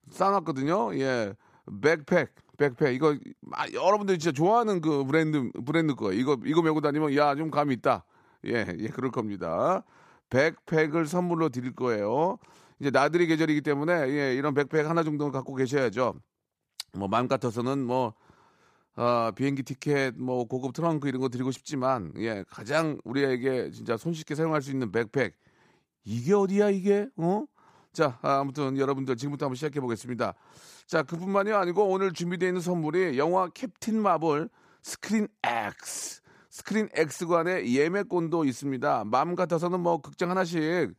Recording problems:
none

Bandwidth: 15 kHz